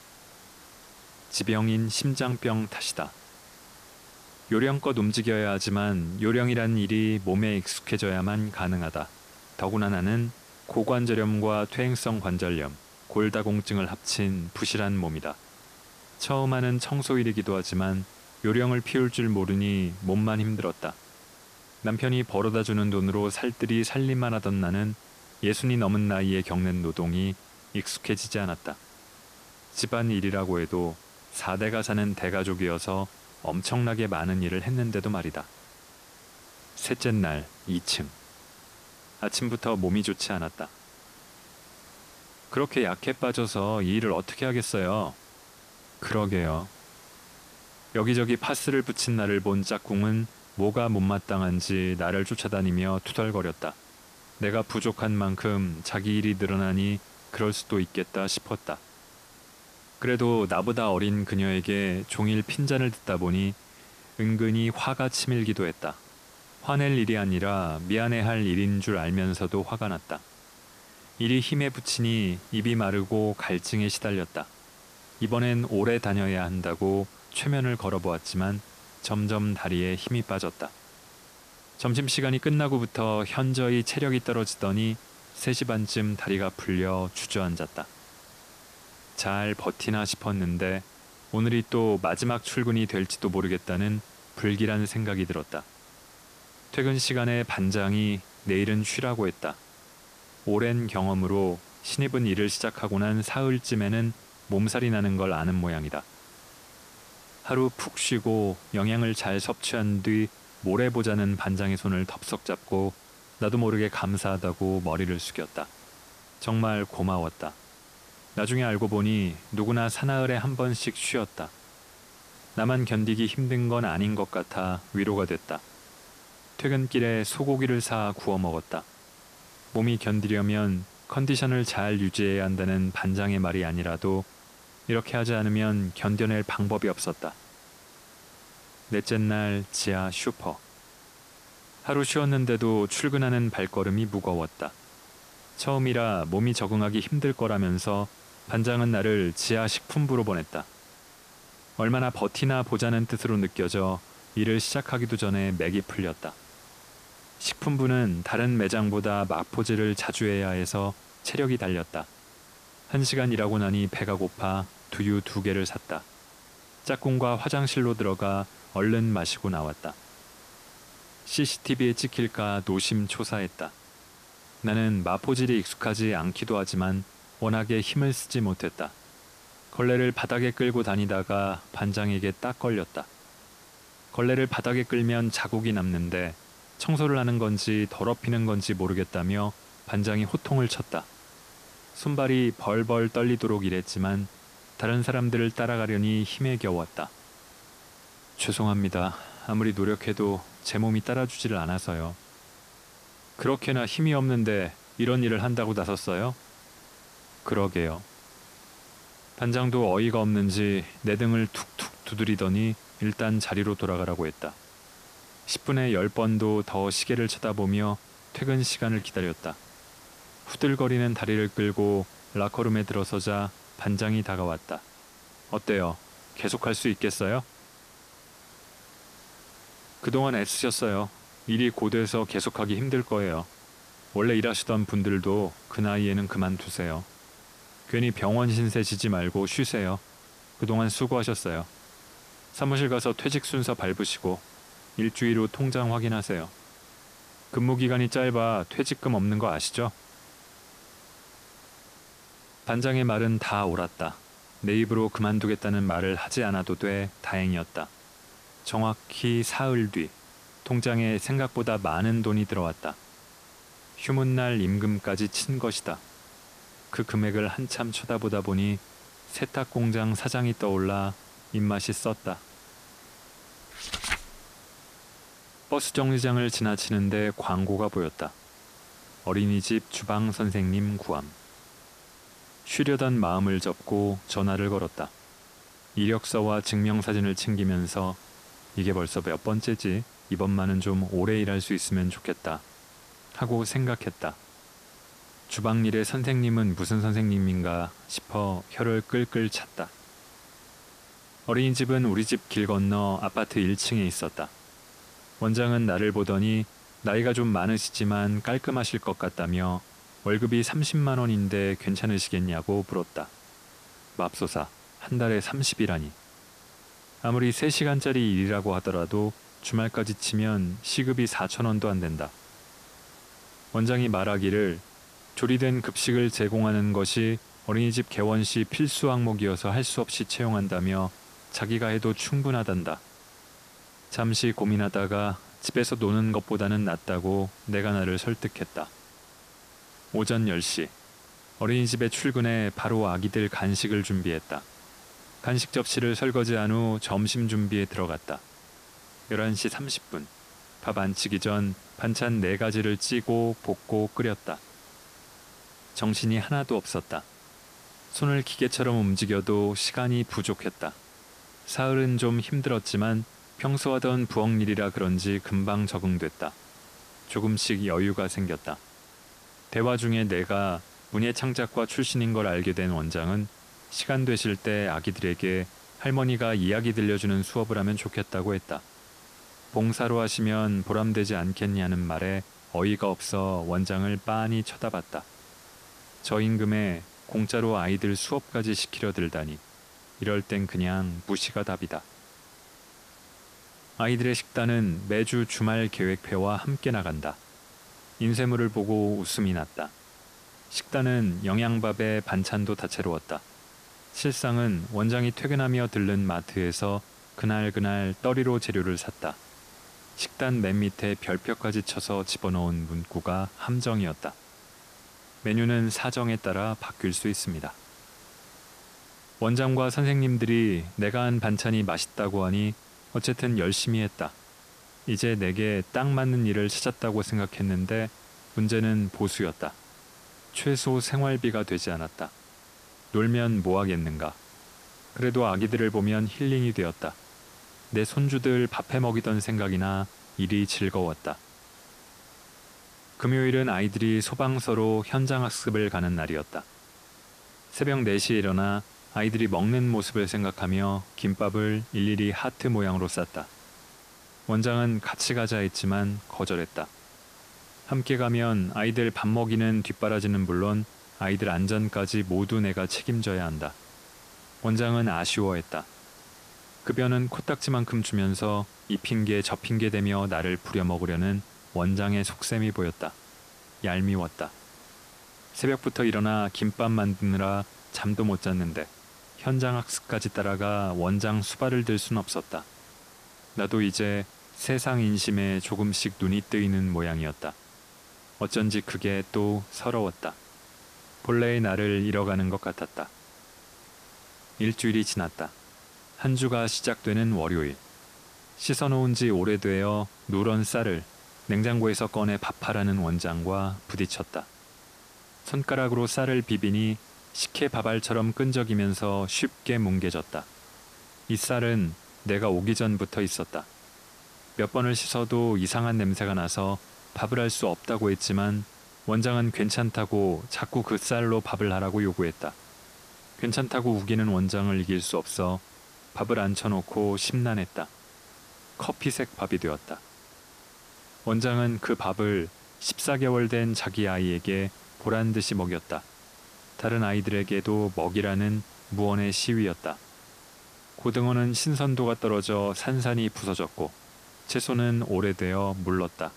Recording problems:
hiss; faint; throughout; 20 dB below the speech

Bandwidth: 14.5 kHz